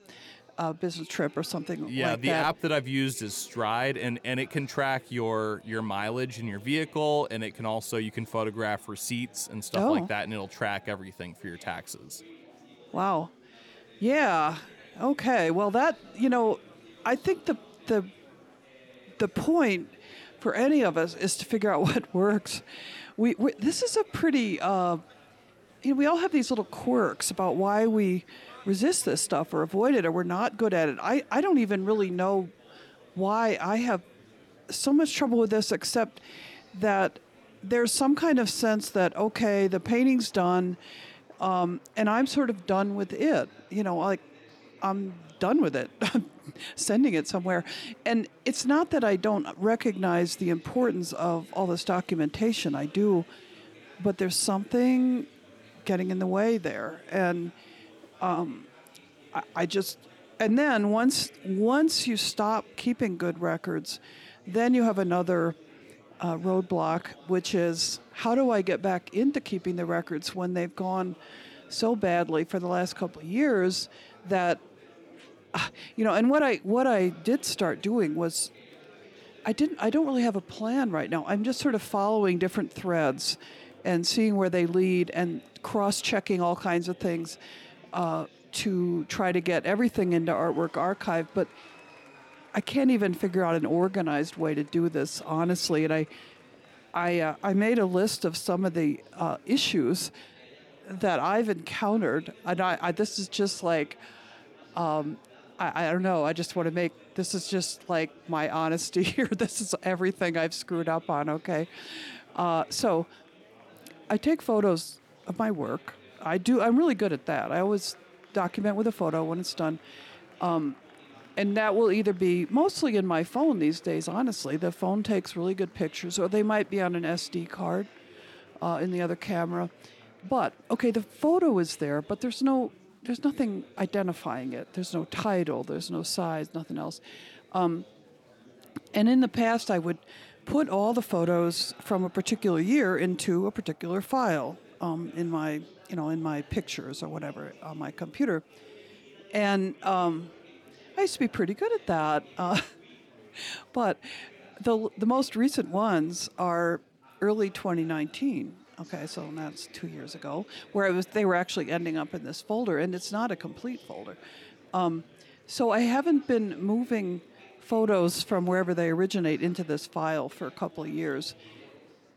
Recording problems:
chatter from many people; faint; throughout; 25 dB below the speech

